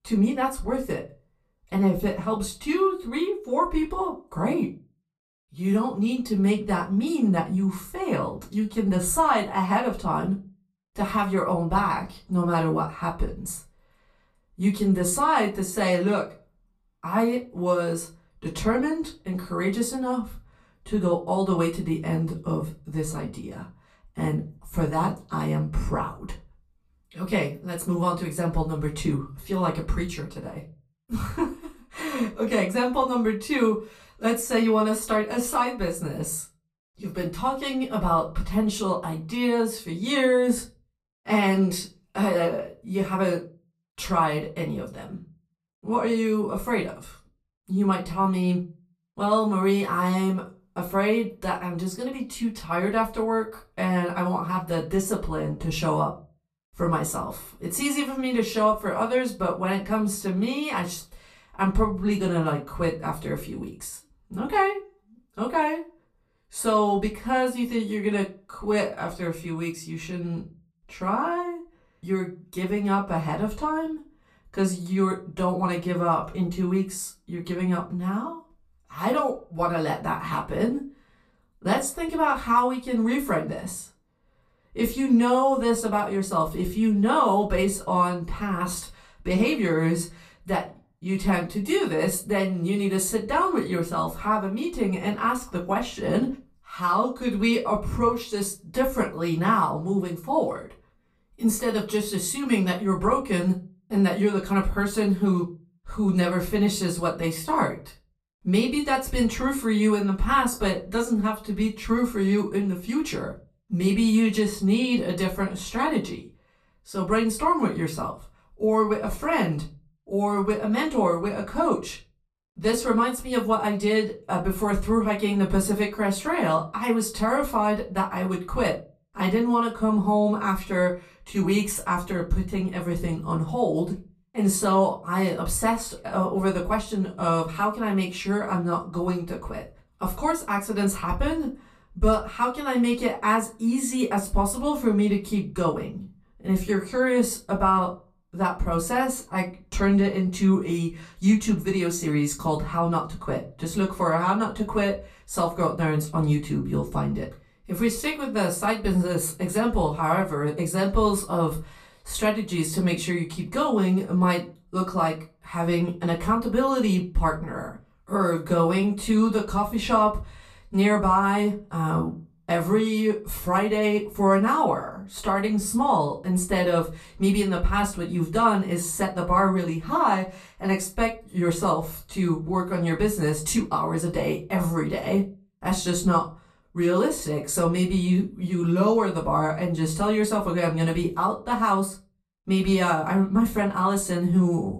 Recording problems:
off-mic speech; far
room echo; very slight; dies away in 0.3 s

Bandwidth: 14.5 kHz